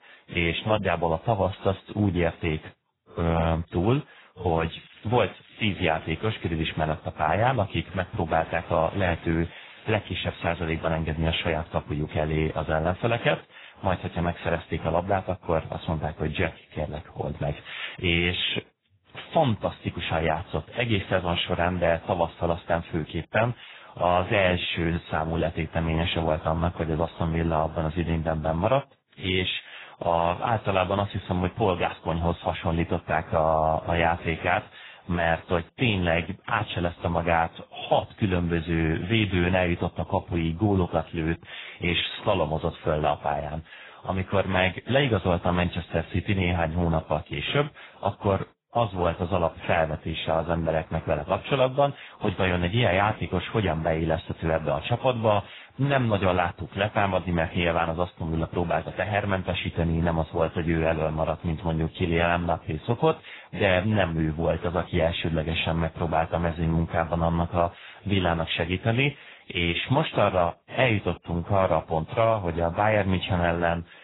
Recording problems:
garbled, watery; badly; nothing above 4 kHz
crackling; faint; from 4.5 to 7 s, from 8.5 to 11 s and at 34 s; 25 dB below the speech

